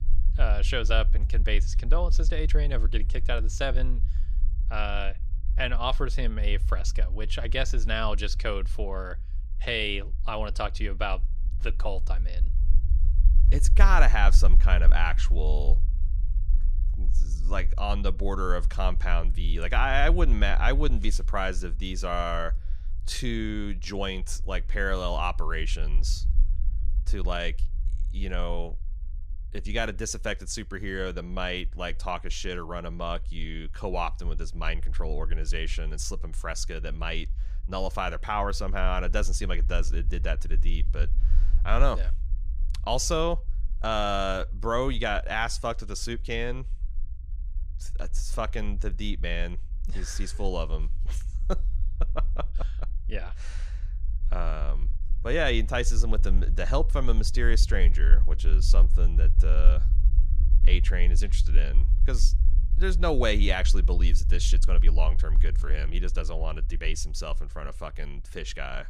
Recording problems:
low rumble; faint; throughout; 20 dB below the speech

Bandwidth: 15 kHz